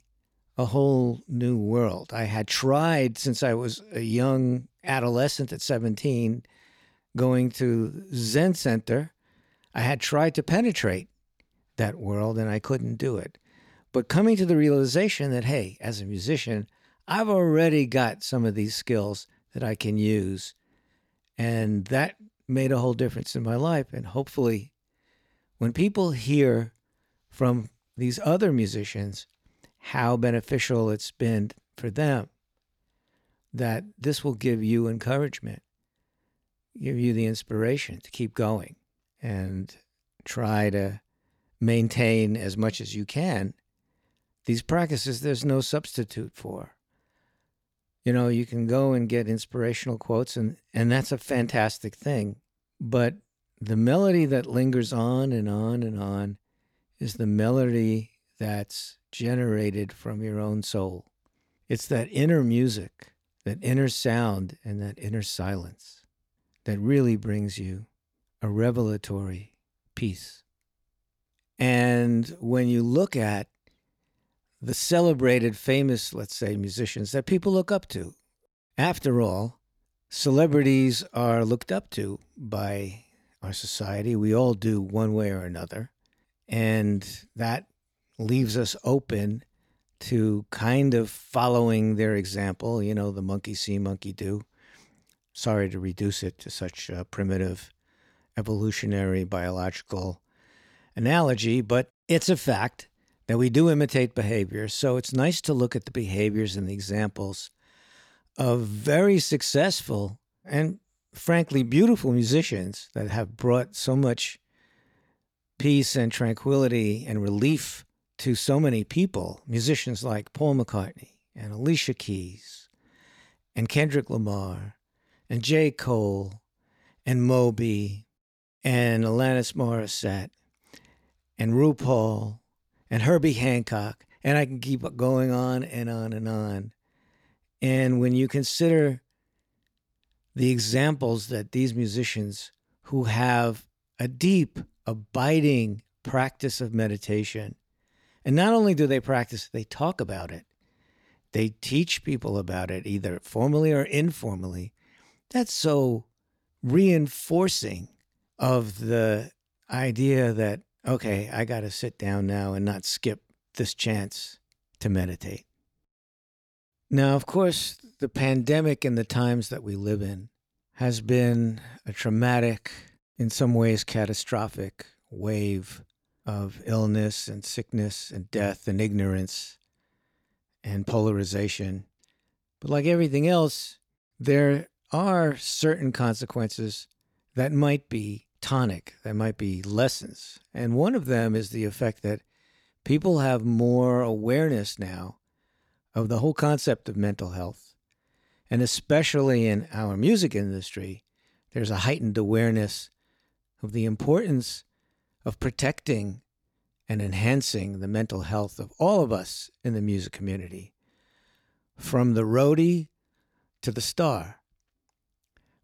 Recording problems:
none

